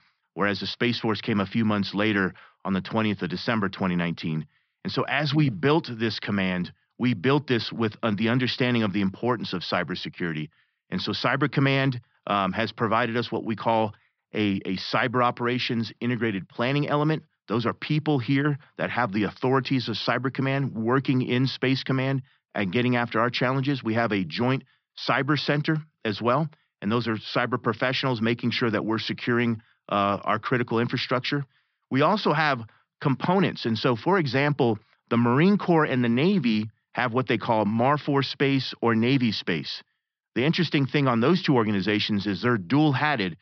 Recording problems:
high frequencies cut off; noticeable; nothing above 5.5 kHz

